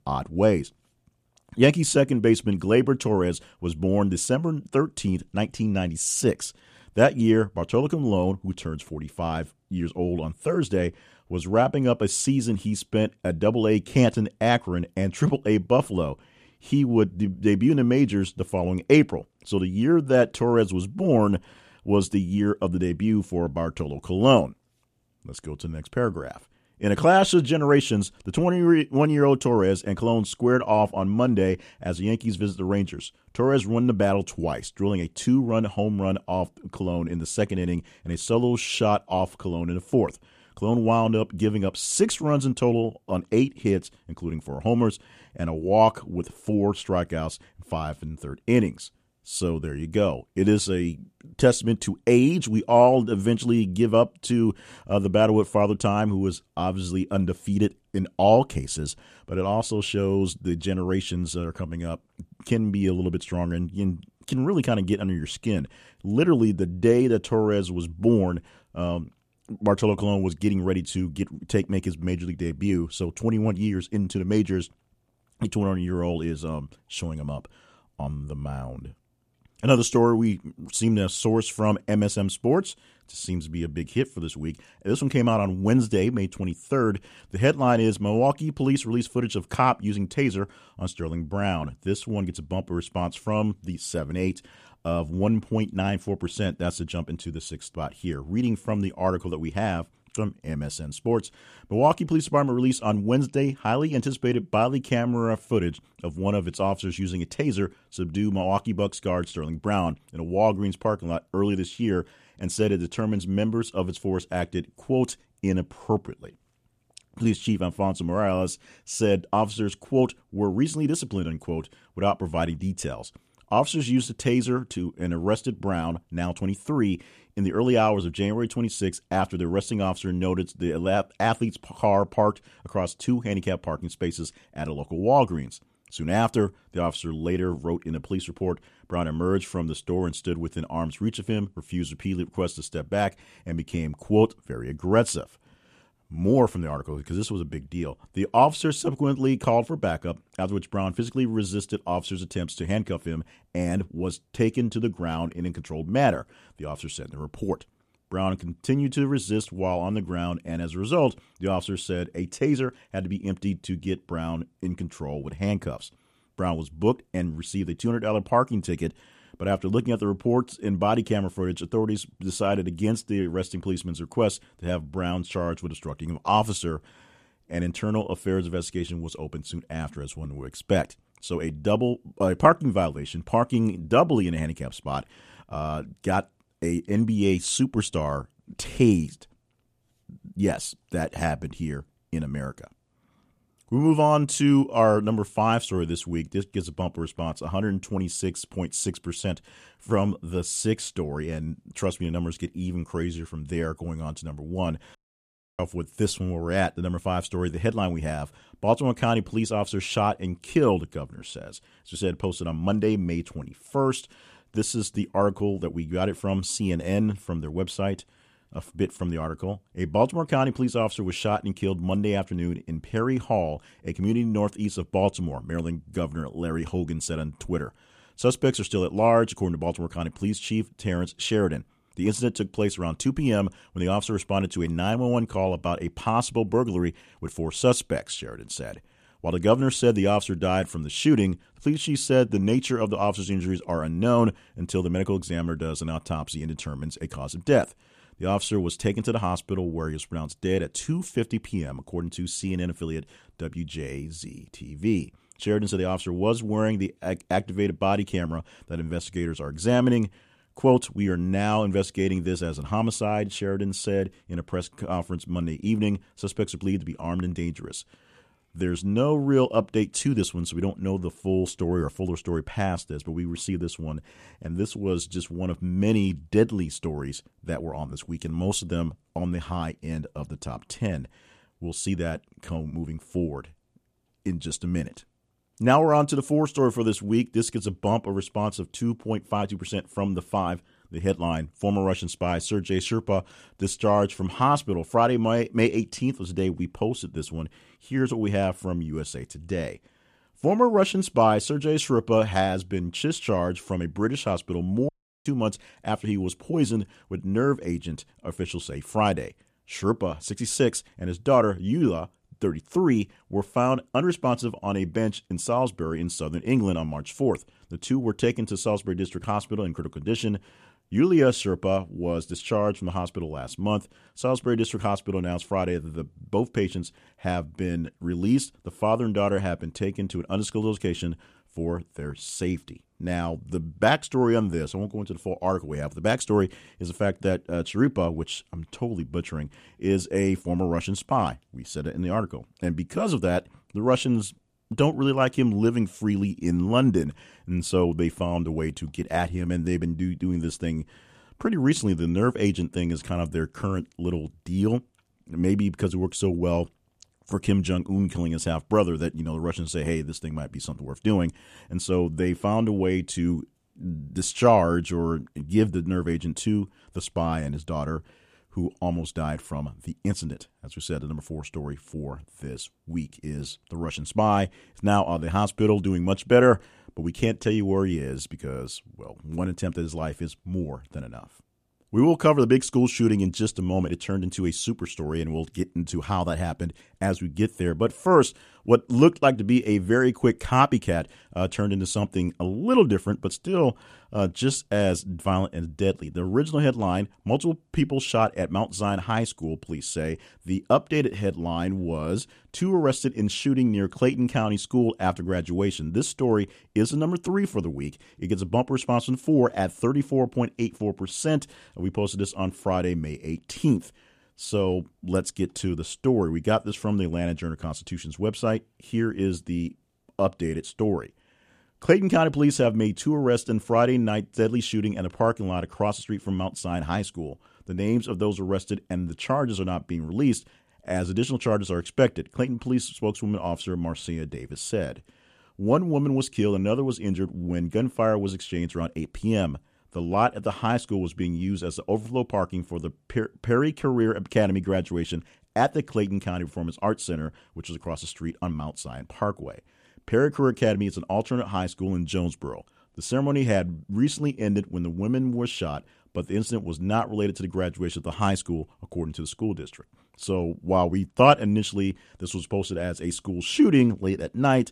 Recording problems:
audio cutting out; at 3:25 for 0.5 s and at 5:05

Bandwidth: 14.5 kHz